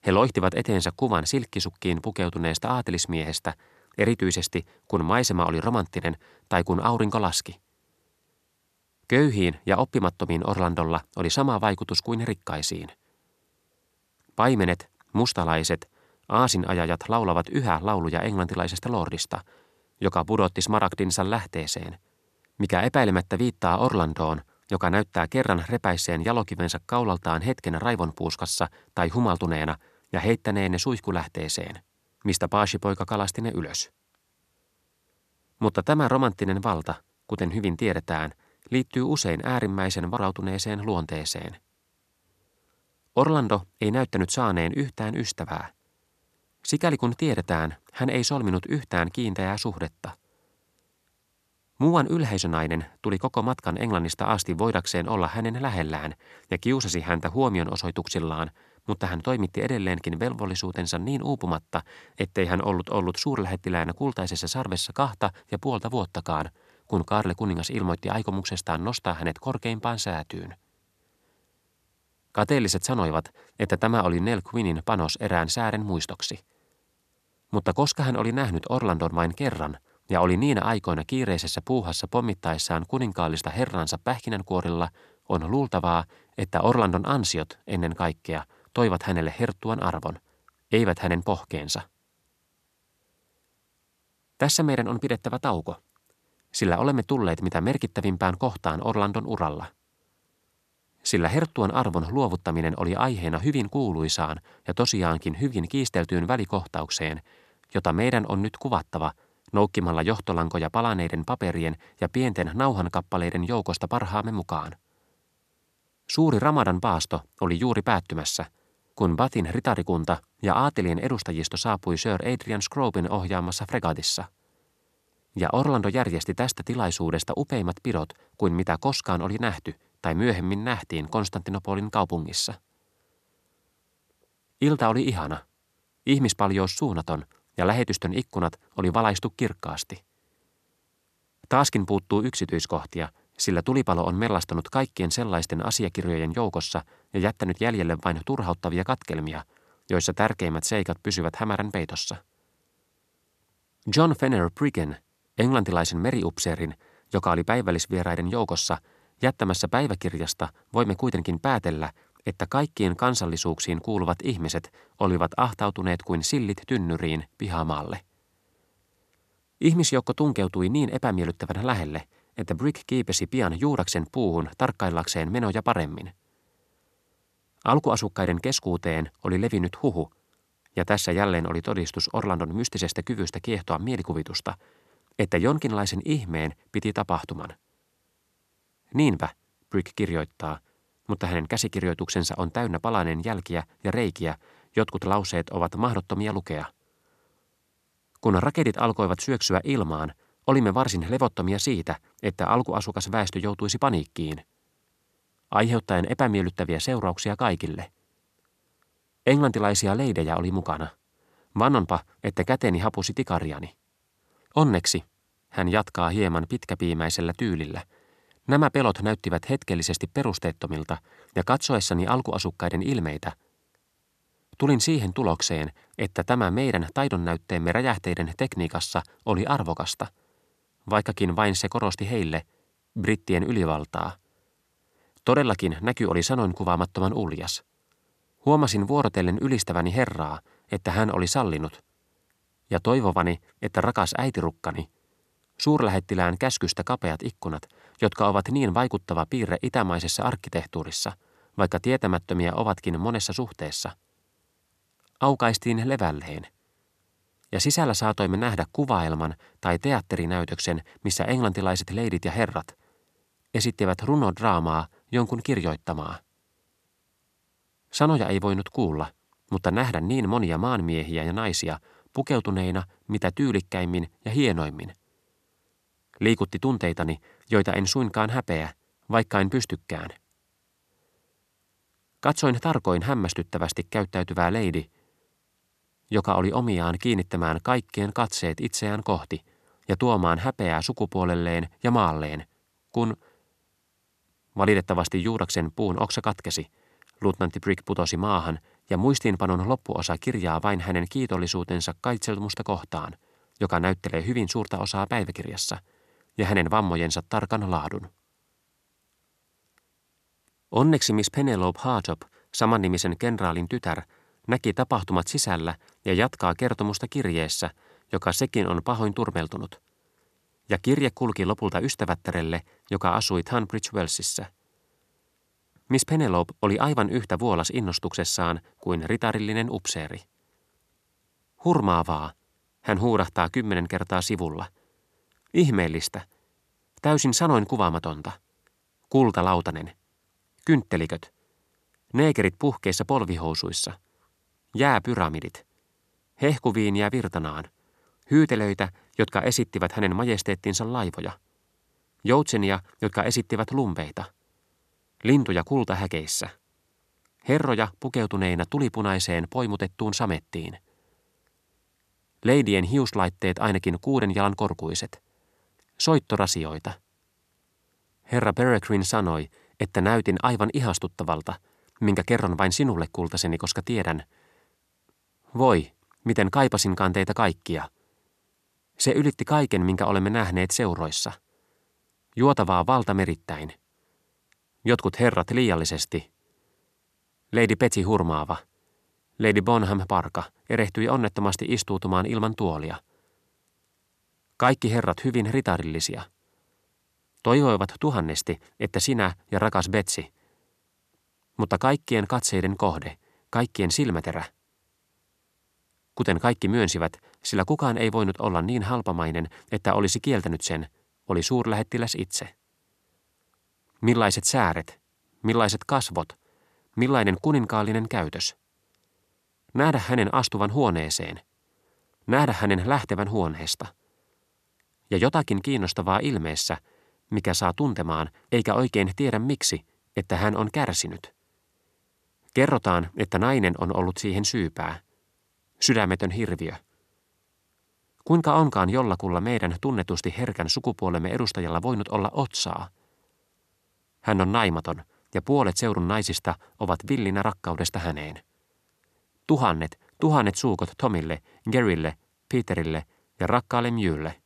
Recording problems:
none

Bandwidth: 13.5 kHz